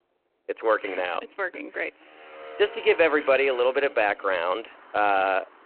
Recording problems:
phone-call audio
traffic noise; noticeable; throughout; 20 dB below the speech

